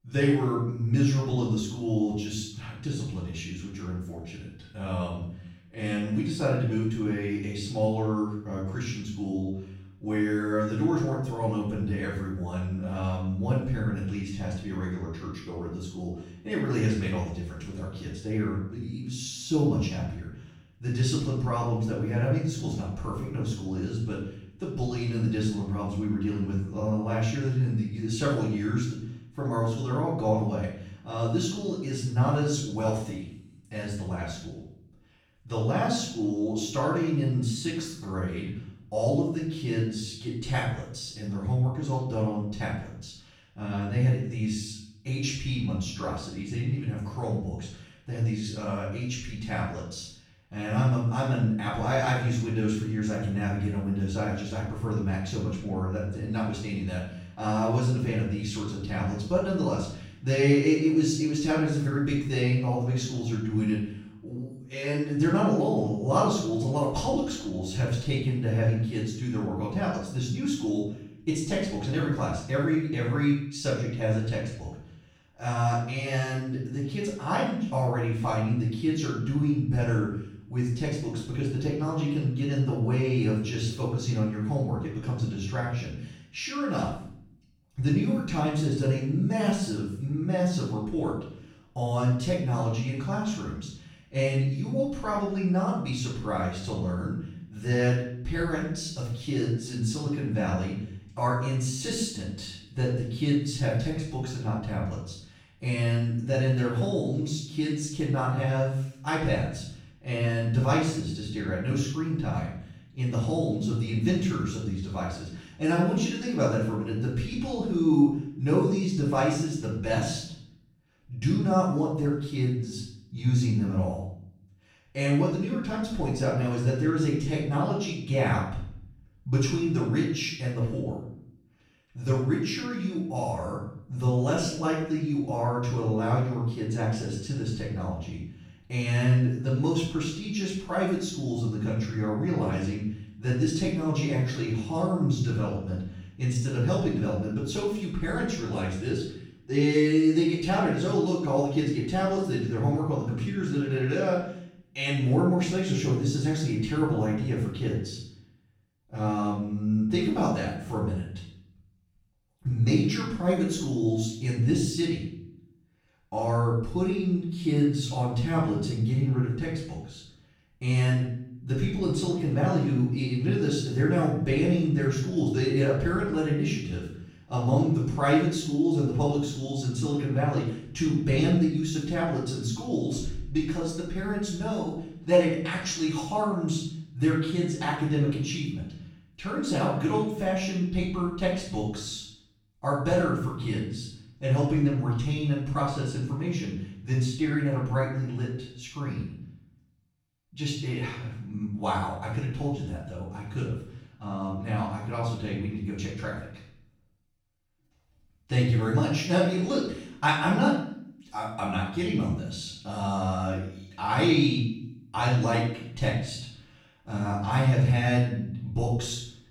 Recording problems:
off-mic speech; far
room echo; noticeable; dies away in 0.6 s

